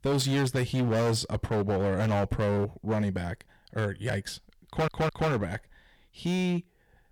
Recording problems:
distortion; heavy; 15% of the sound clipped
audio stuttering; at 4.5 s

